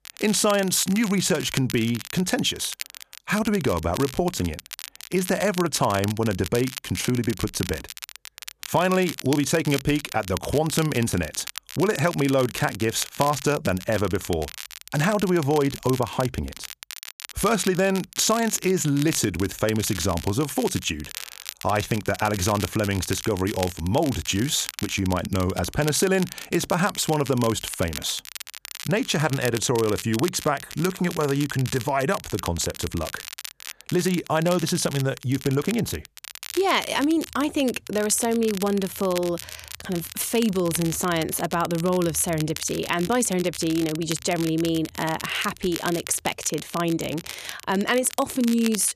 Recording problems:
crackle, like an old record; noticeable; 10 dB below the speech

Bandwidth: 14.5 kHz